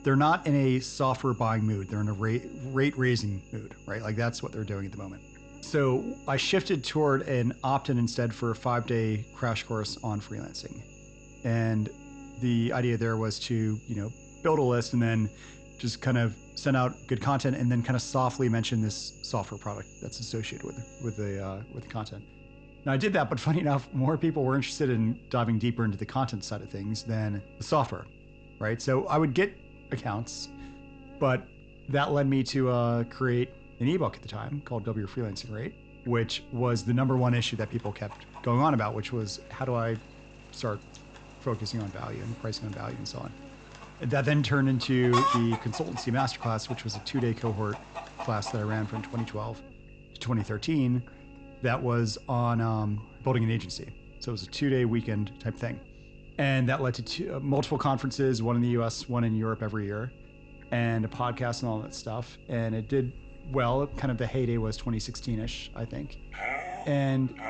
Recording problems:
high frequencies cut off; noticeable; nothing above 8 kHz
animal sounds; noticeable; throughout; 10 dB below the speech
electrical hum; faint; throughout; 50 Hz, 20 dB below the speech

